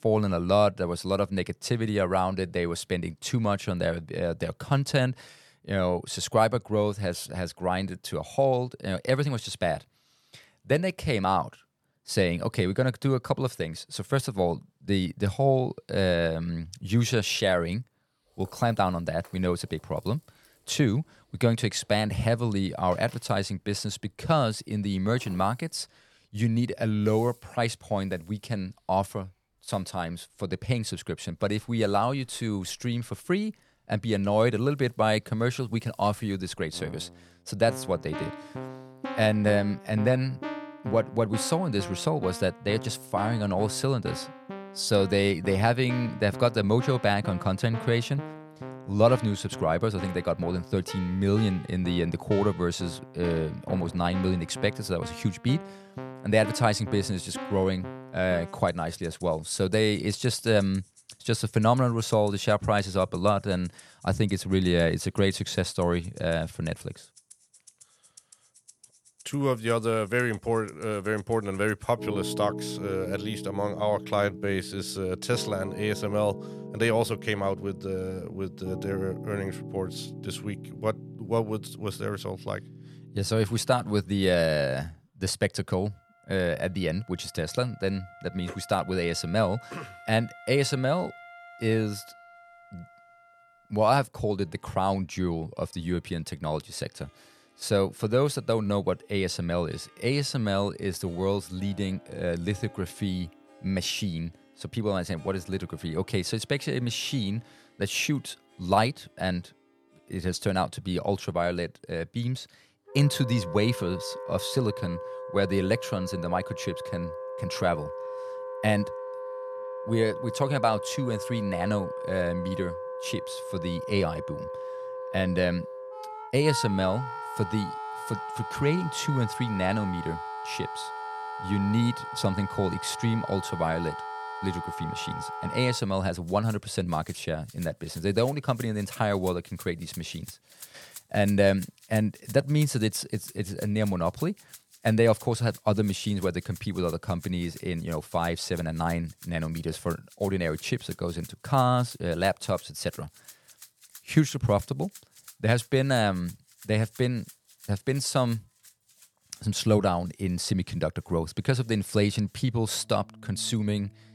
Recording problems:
background music; noticeable; throughout; 10 dB below the speech

